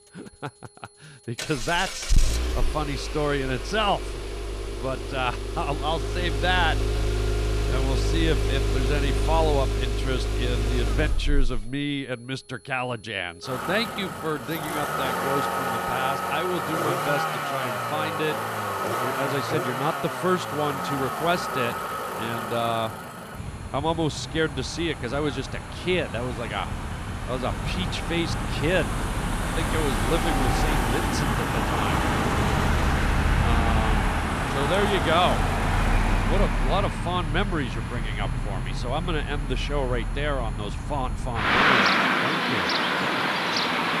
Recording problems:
traffic noise; very loud; throughout; 2 dB above the speech
high-pitched whine; faint; throughout; 10 kHz, 25 dB below the speech

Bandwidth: 14 kHz